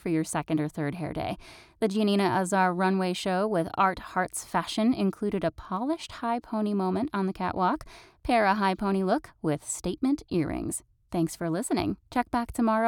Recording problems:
abrupt cut into speech; at the end

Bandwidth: 18.5 kHz